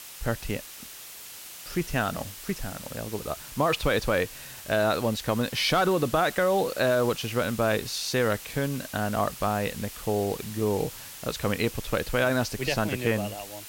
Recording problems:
hiss; noticeable; throughout; 10 dB below the speech

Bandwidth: 16.5 kHz